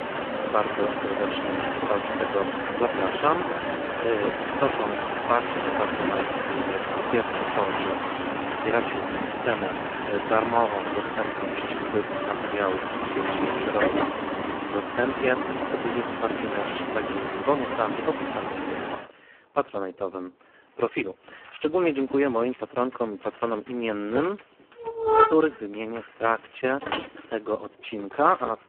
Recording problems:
phone-call audio; poor line
traffic noise; very loud; throughout; as loud as the speech

